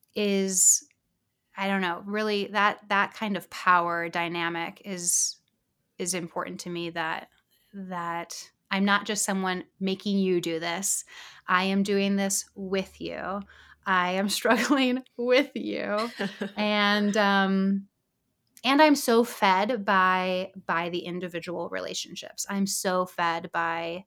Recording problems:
none

